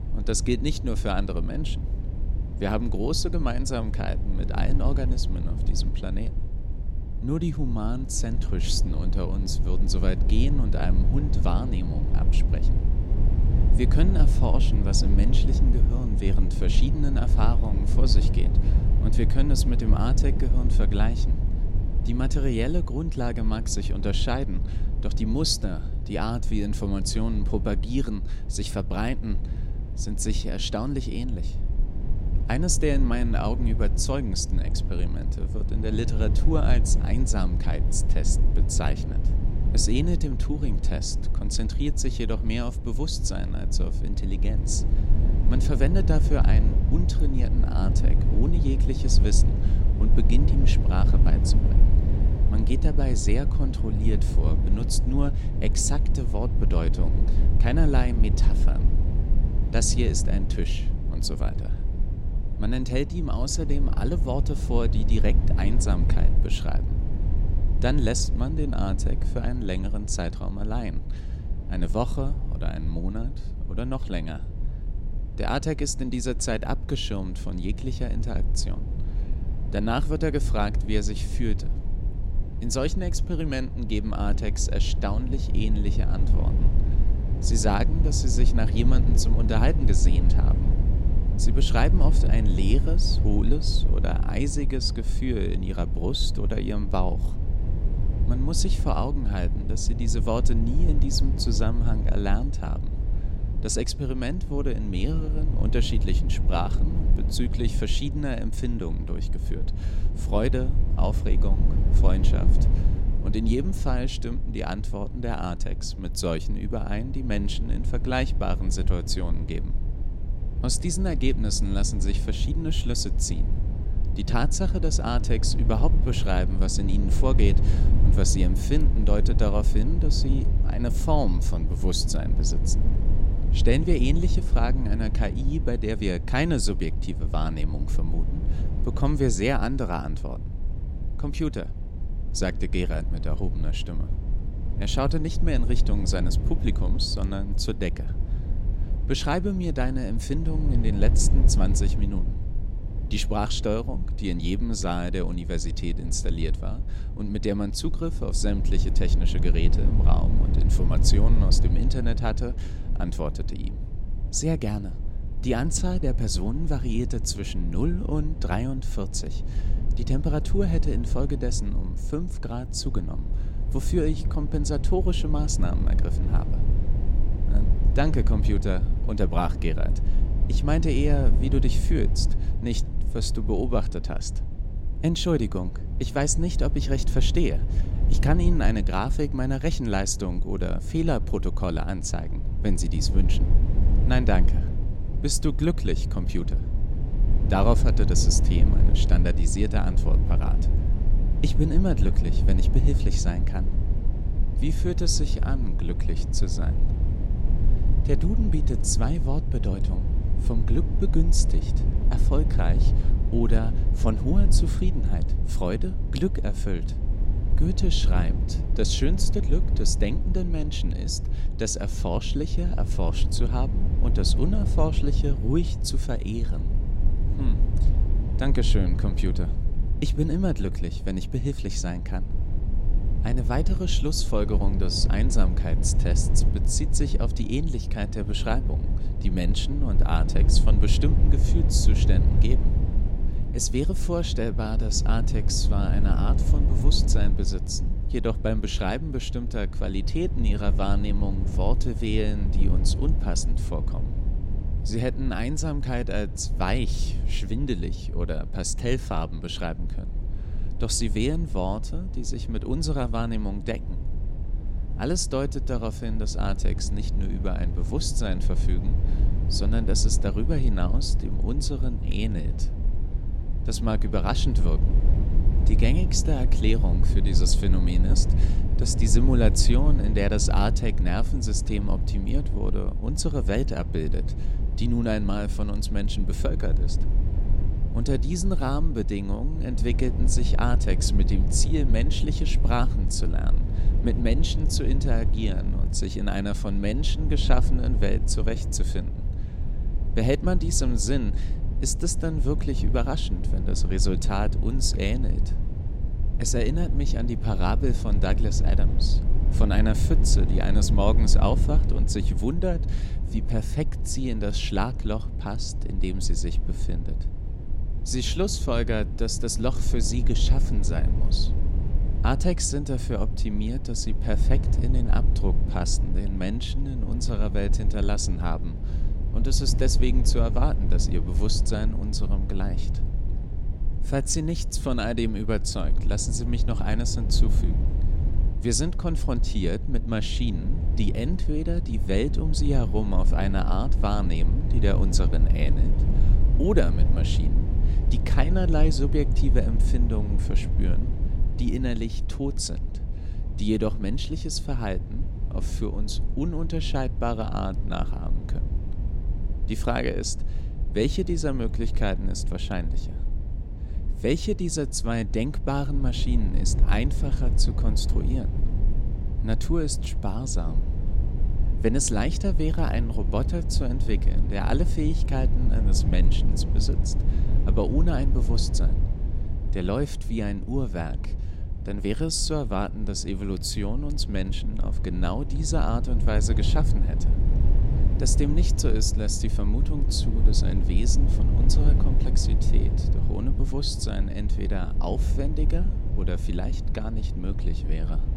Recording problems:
low rumble; loud; throughout; 10 dB below the speech

